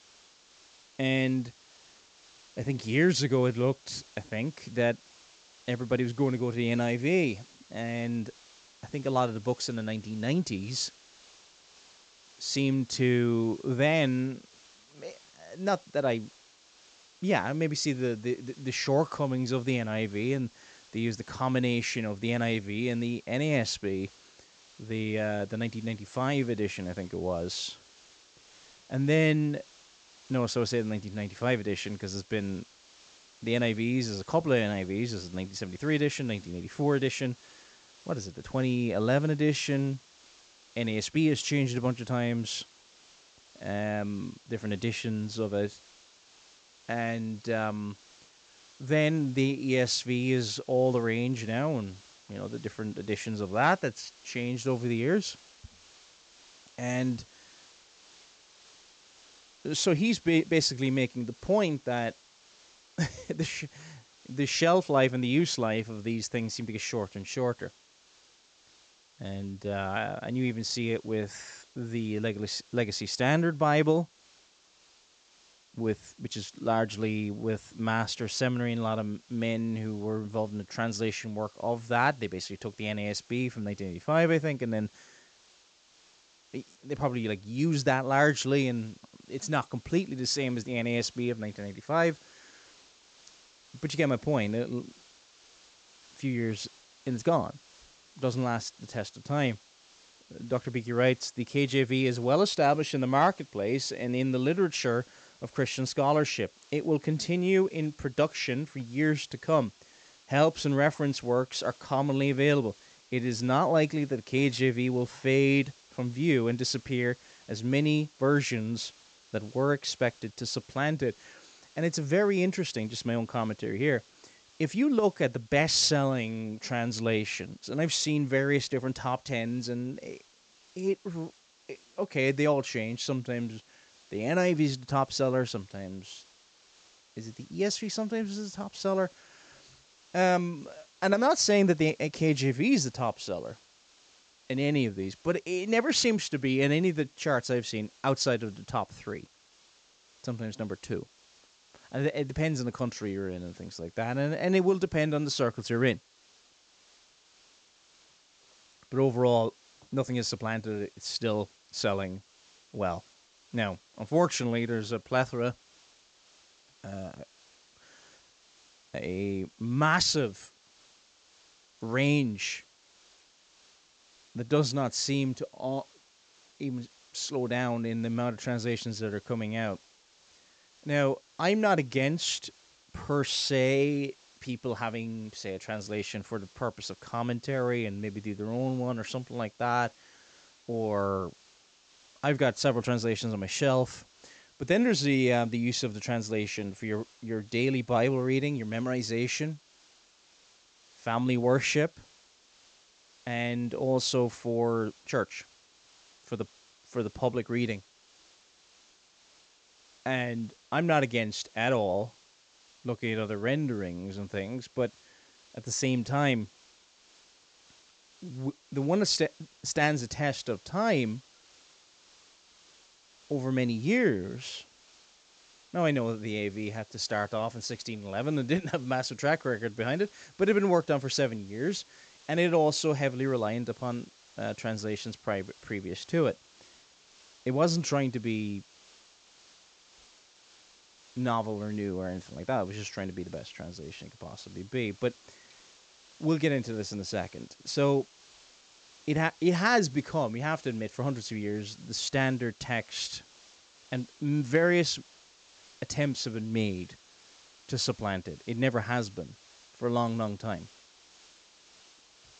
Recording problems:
high frequencies cut off; noticeable; nothing above 8 kHz
hiss; faint; throughout; 25 dB below the speech

